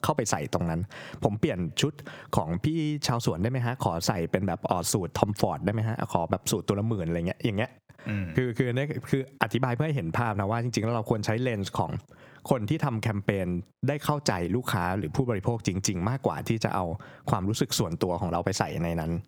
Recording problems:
squashed, flat; heavily

